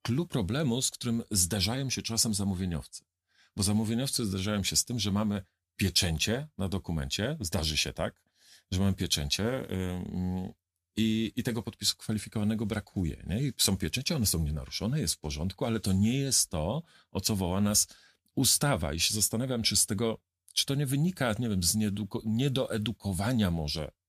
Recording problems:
none

